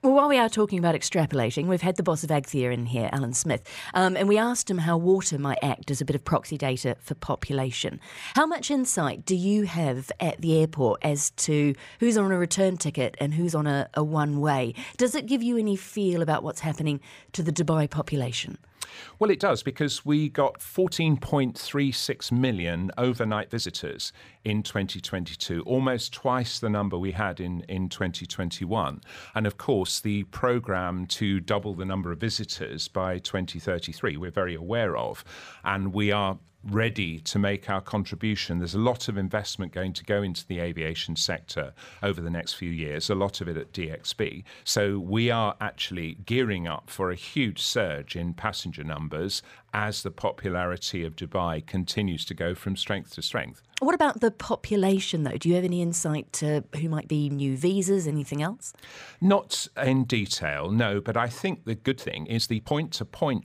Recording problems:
uneven, jittery; strongly; from 3 s to 1:03

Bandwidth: 15 kHz